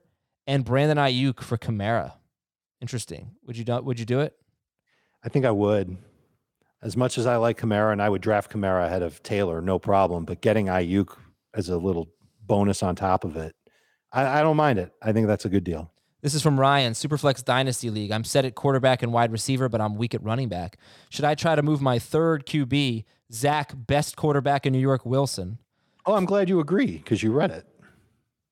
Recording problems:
none

